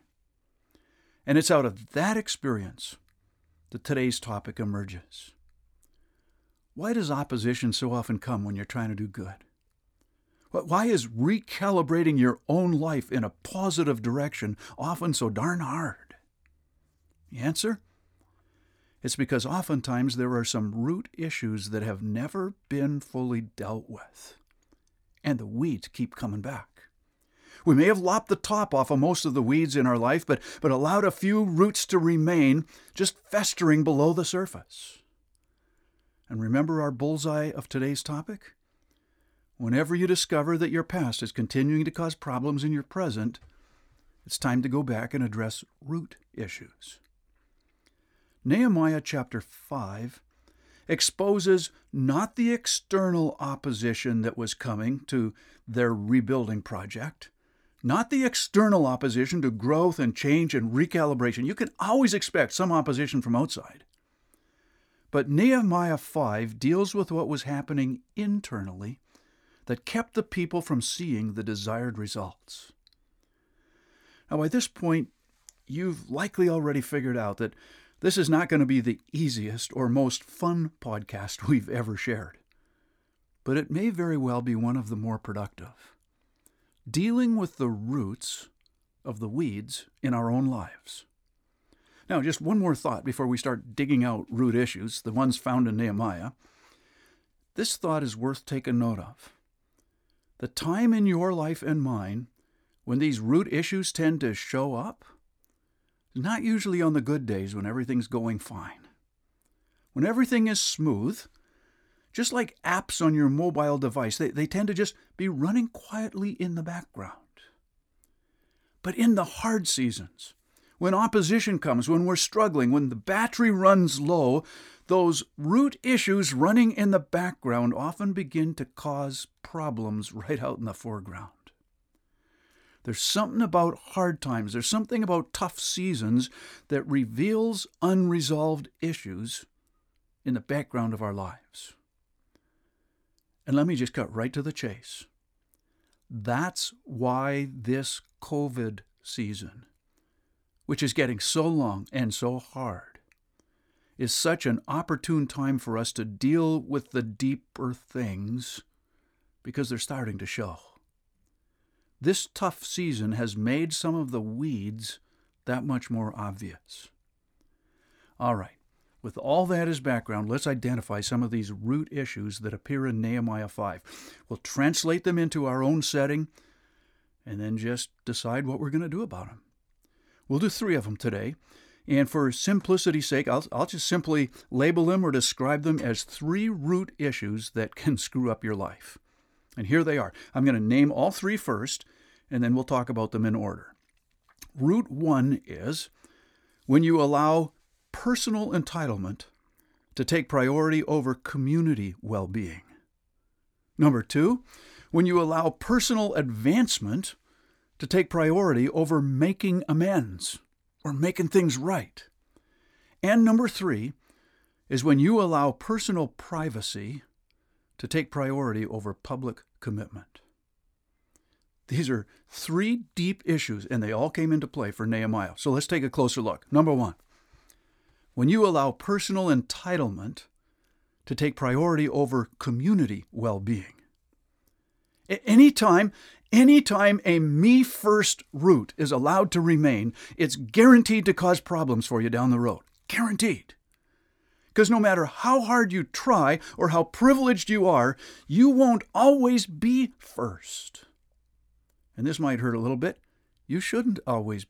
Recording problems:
none

